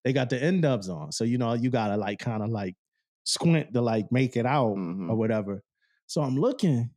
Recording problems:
none

